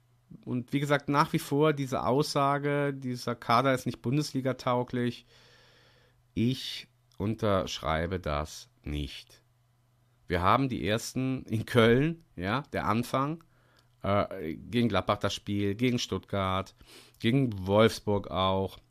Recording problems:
none

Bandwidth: 14.5 kHz